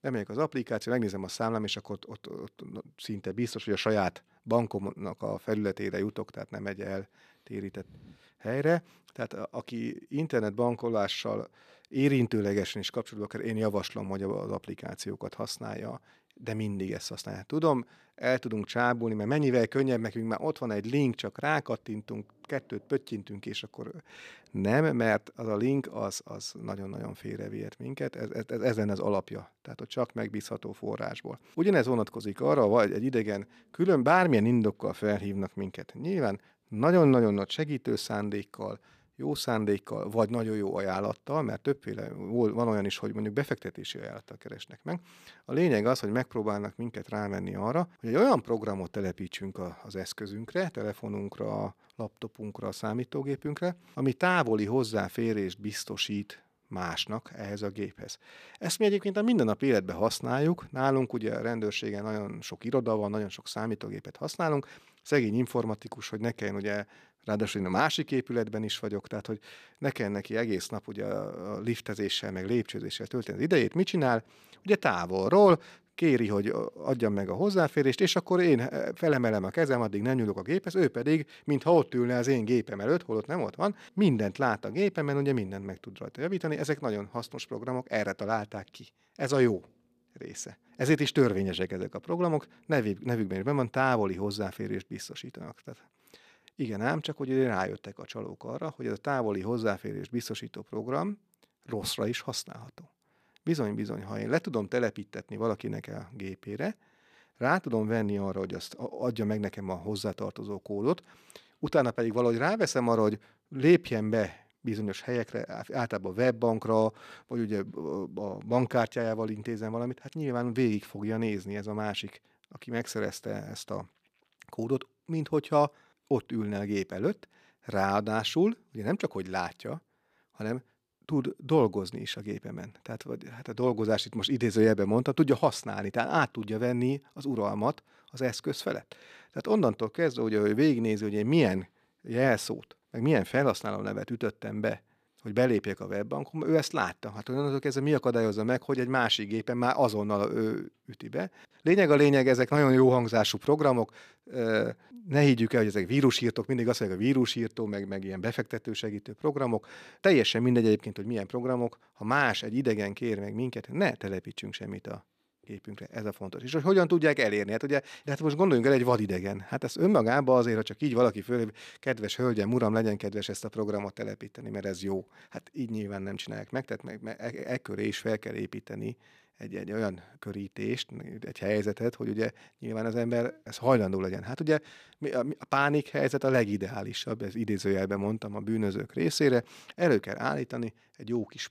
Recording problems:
none

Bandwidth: 14.5 kHz